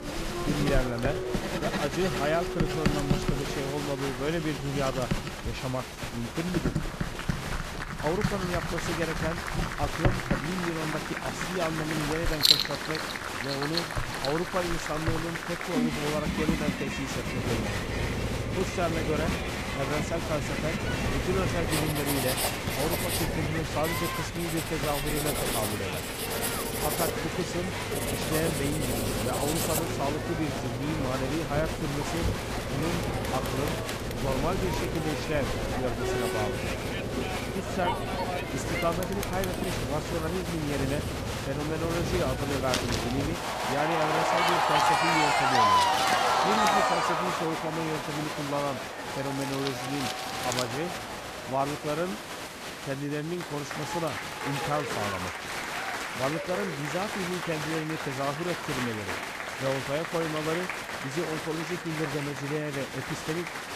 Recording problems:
crowd noise; very loud; throughout; 1 dB above the speech
household noises; loud; throughout; as loud as the speech
low rumble; loud; from 17 to 43 s; 6 dB below the speech

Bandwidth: 14.5 kHz